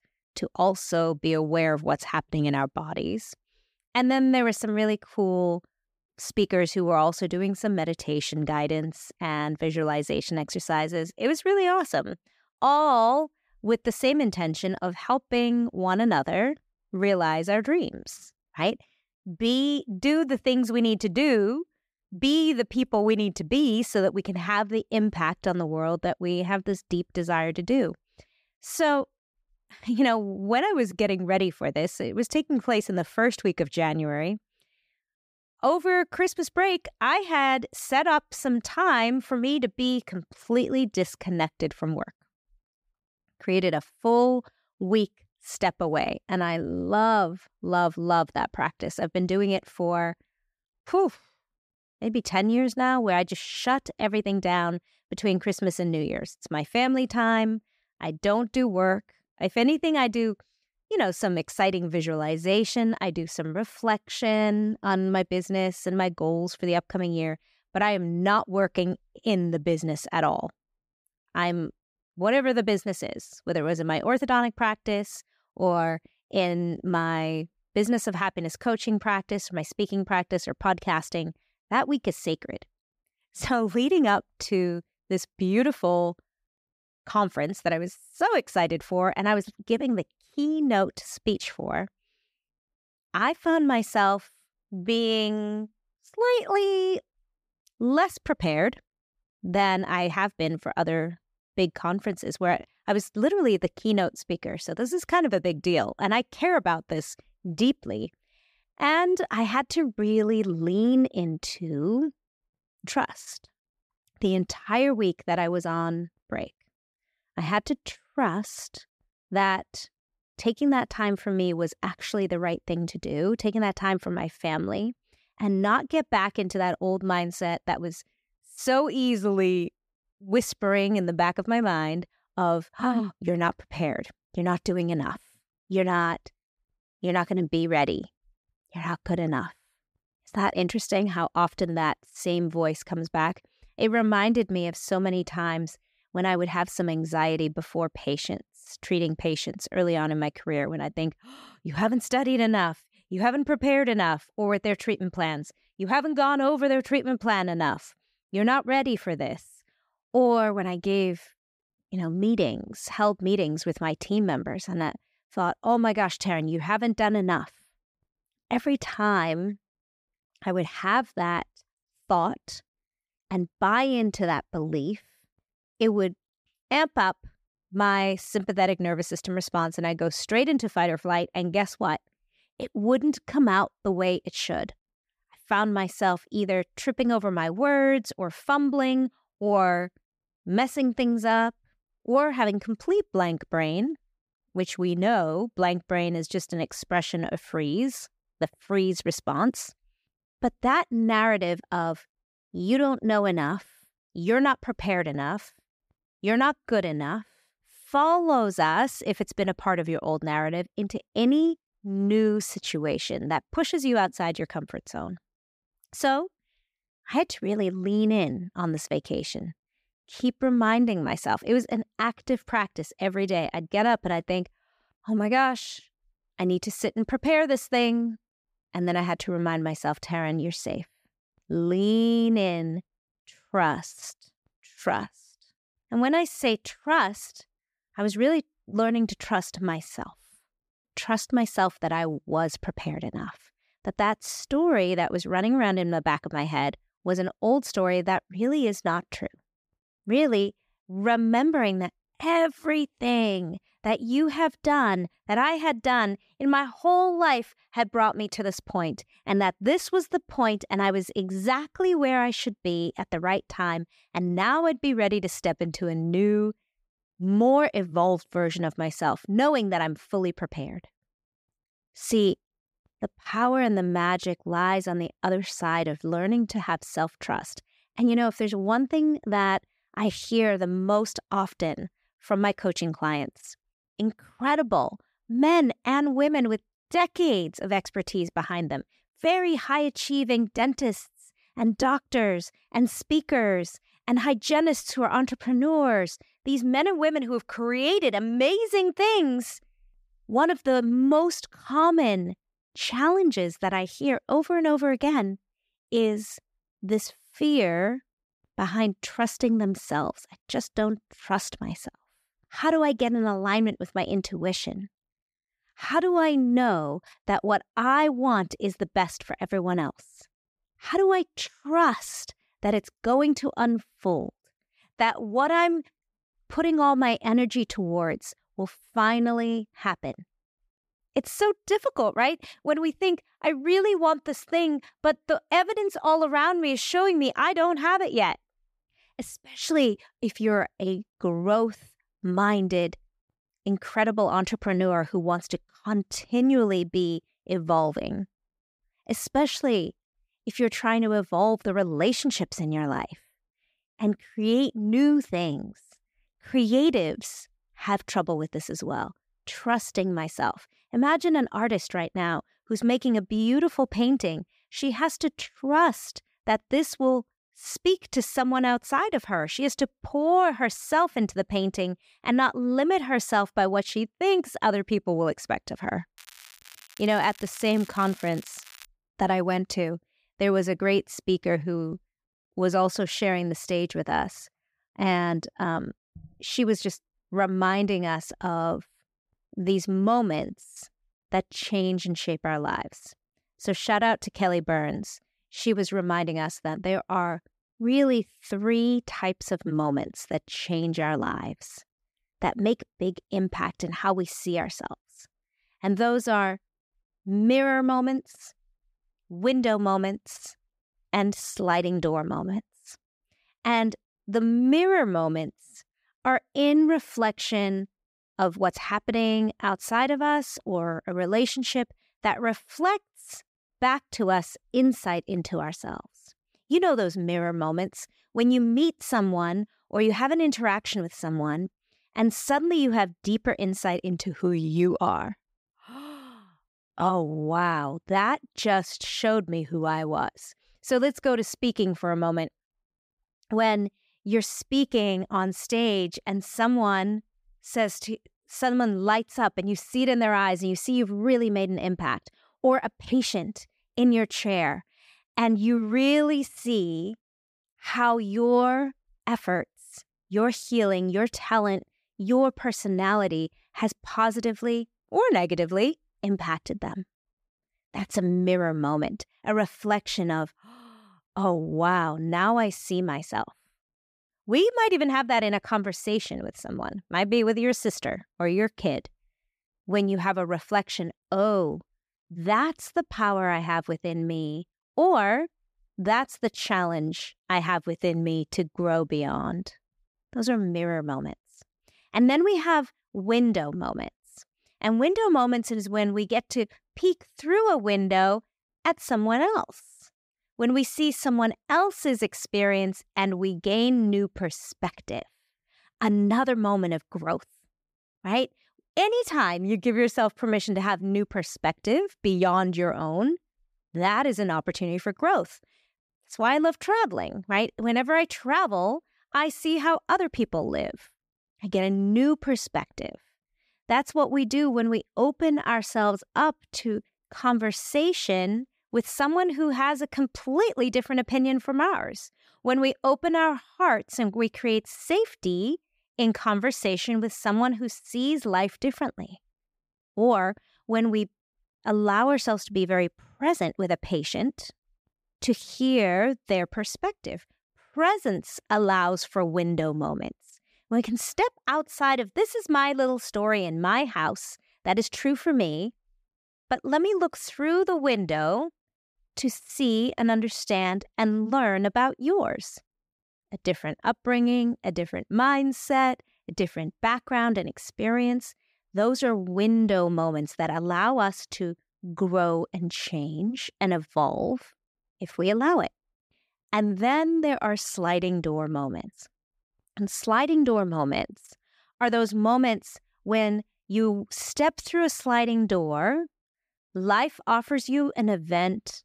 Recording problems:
crackling; faint; from 6:16 to 6:19; 20 dB below the speech

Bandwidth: 15 kHz